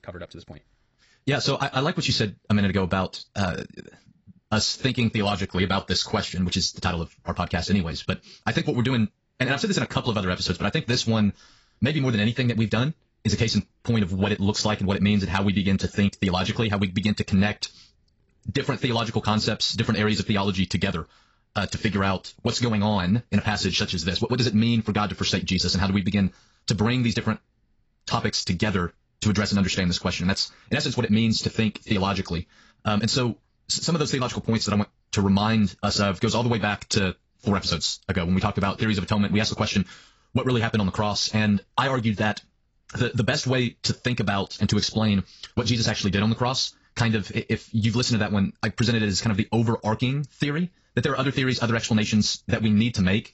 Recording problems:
garbled, watery; badly; nothing above 7.5 kHz
wrong speed, natural pitch; too fast; 1.6 times normal speed

